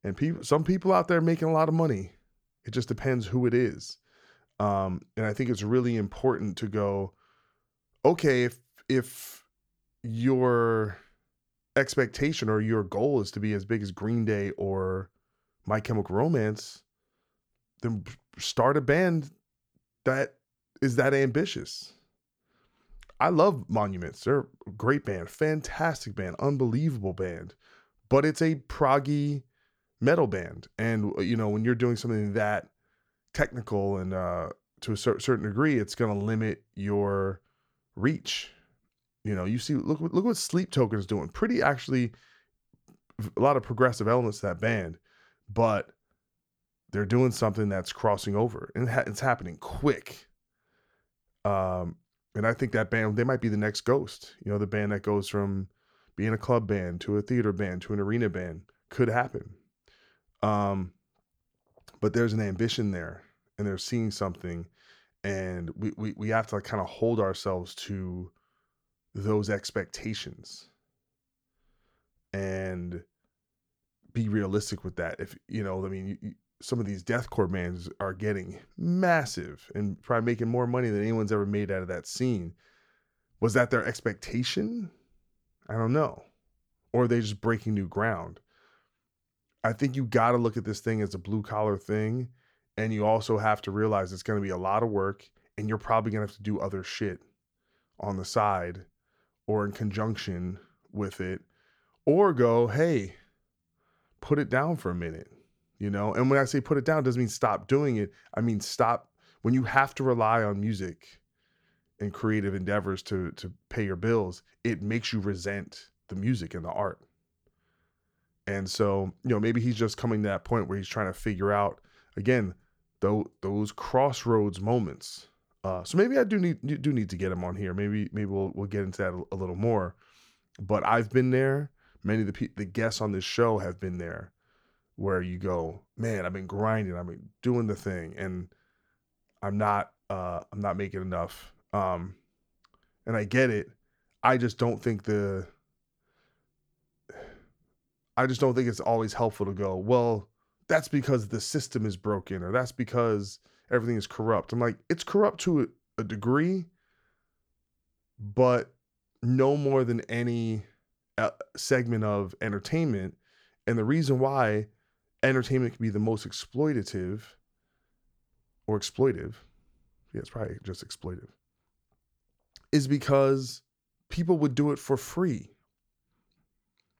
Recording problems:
none

